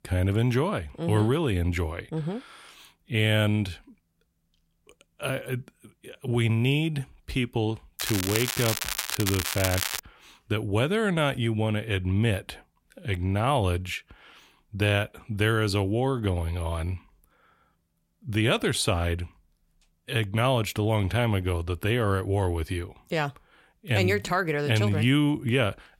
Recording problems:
crackling; loud; from 8 to 10 s; 3 dB below the speech

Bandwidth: 16 kHz